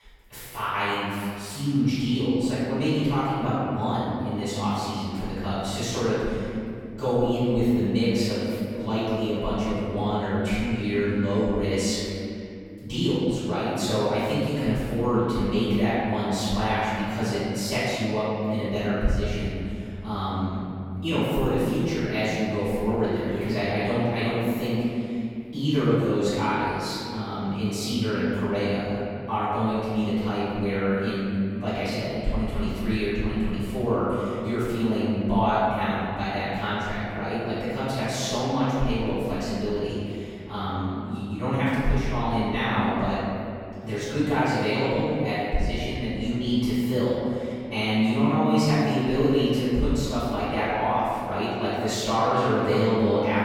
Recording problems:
room echo; strong; dies away in 2.6 s
off-mic speech; far

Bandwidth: 17.5 kHz